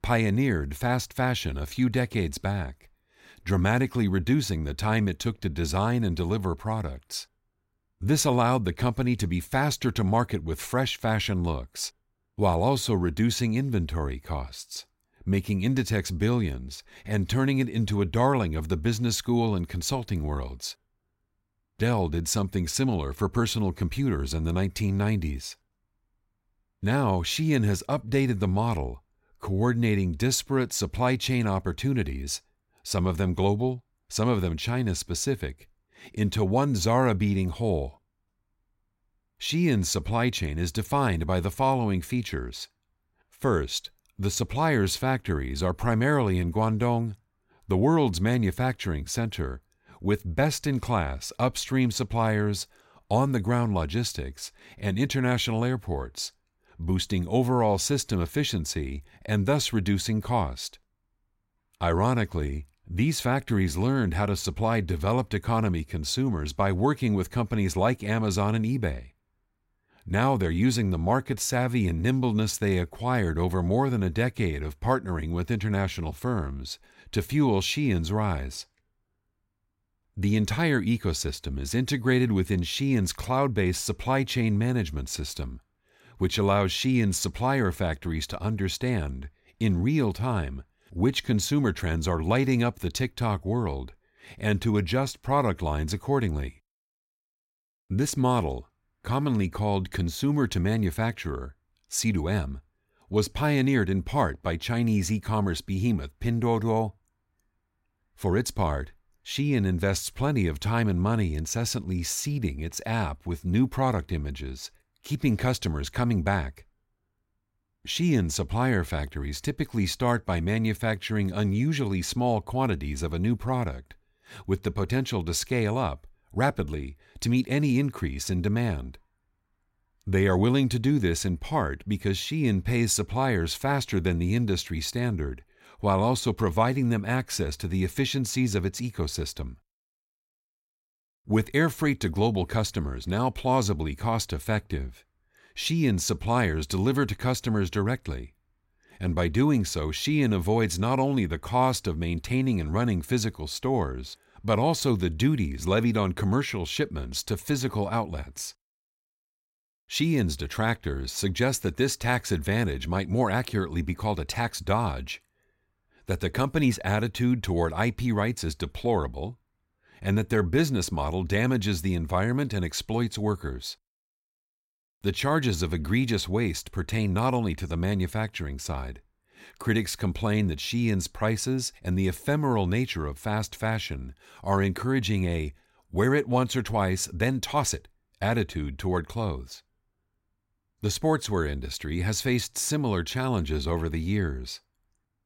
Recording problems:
none

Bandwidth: 16 kHz